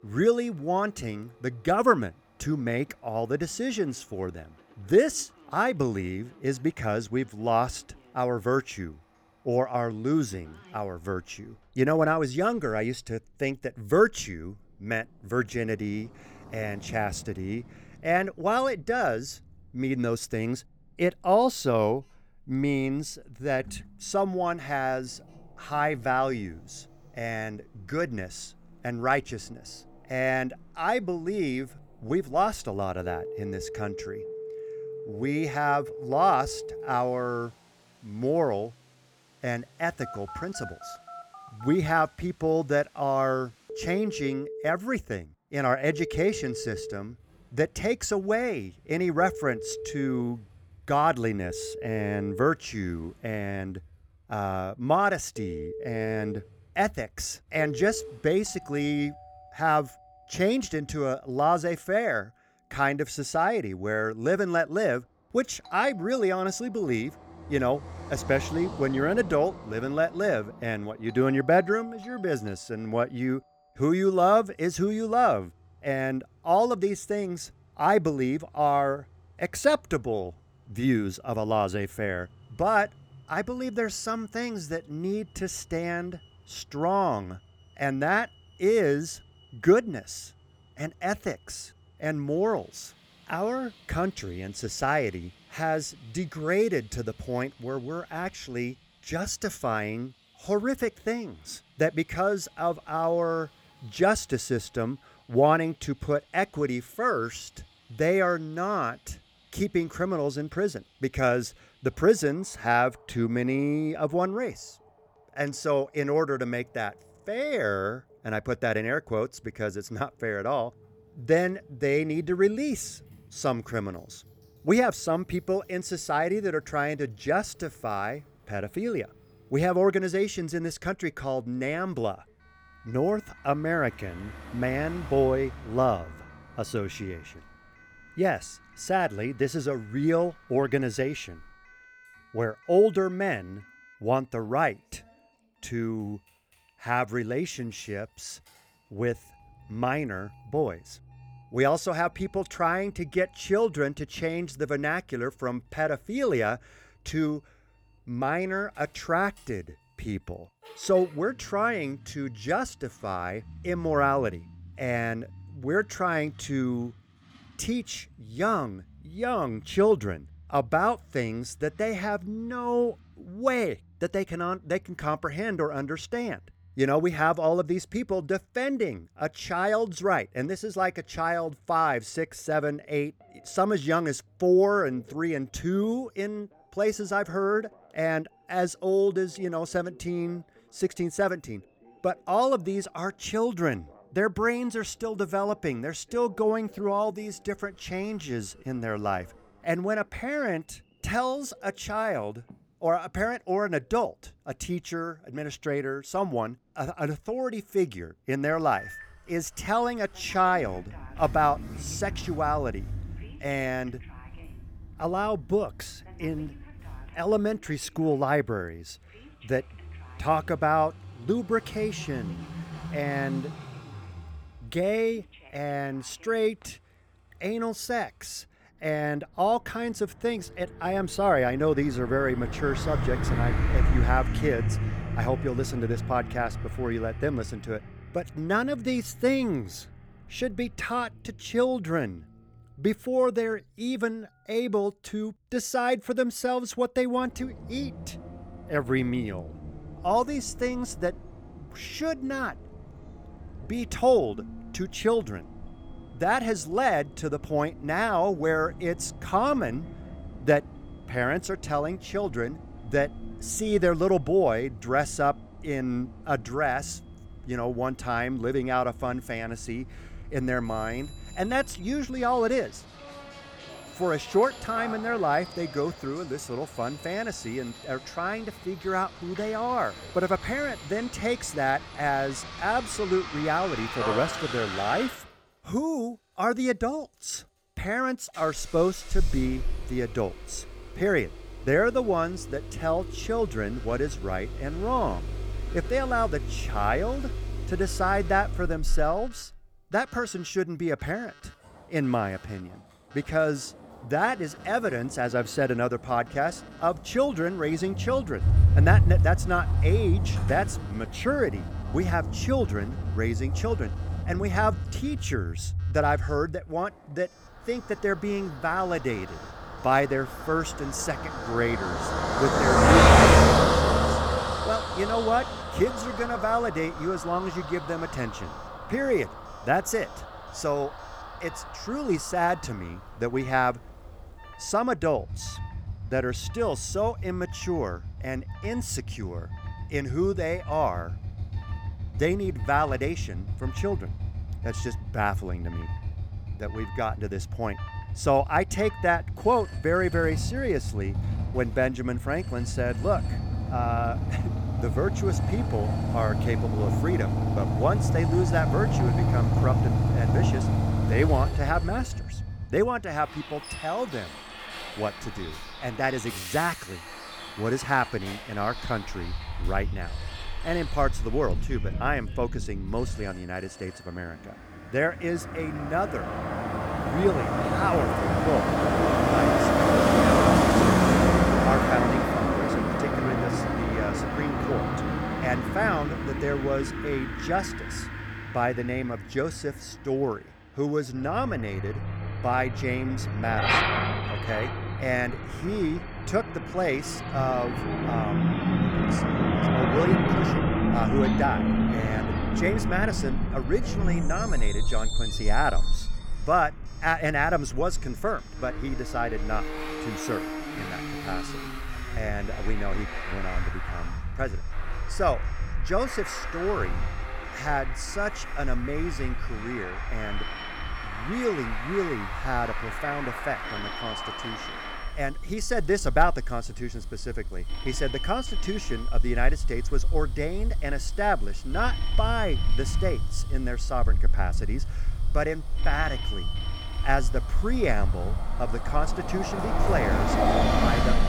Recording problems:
traffic noise; loud; throughout; 1 dB below the speech
alarms or sirens; noticeable; throughout; 20 dB below the speech

